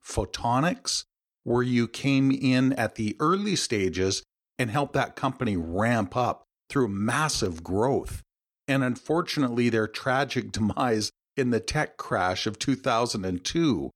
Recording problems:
uneven, jittery; strongly; from 1.5 to 12 s

